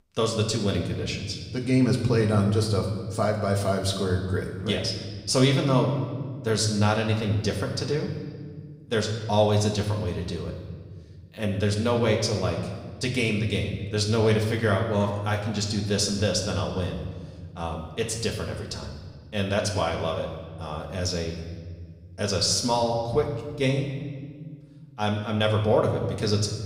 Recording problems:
room echo; slight; dies away in 1.3 s
off-mic speech; somewhat distant

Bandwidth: 15.5 kHz